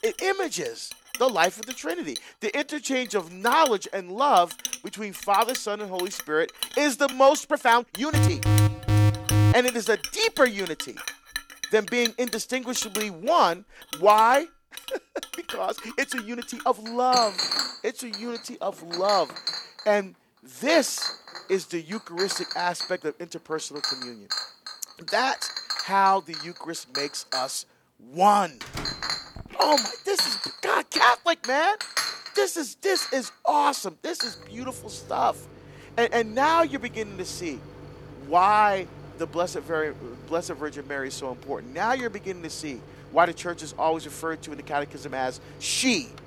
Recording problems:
household noises; loud; throughout; 7 dB below the speech
uneven, jittery; strongly; from 2.5 to 43 s
alarm; loud; from 8 to 9.5 s; peak 4 dB above the speech
door banging; faint; at 29 s; peak 10 dB below the speech

